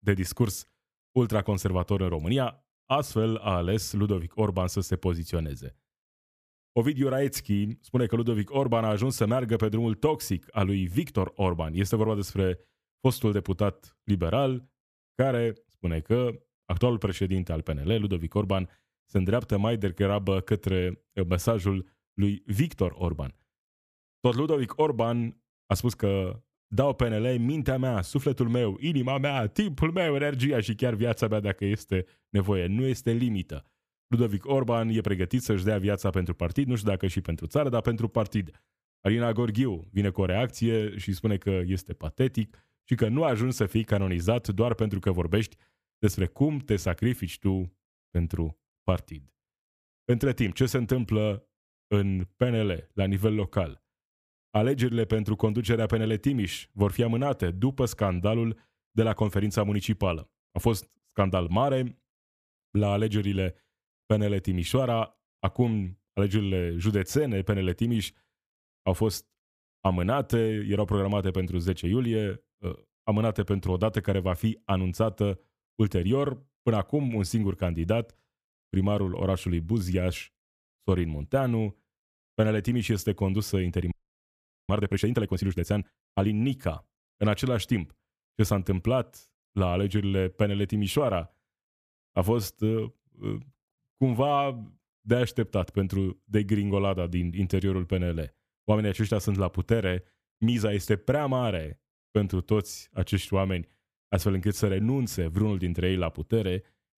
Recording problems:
audio freezing; at 1:24 for 1 s

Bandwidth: 14.5 kHz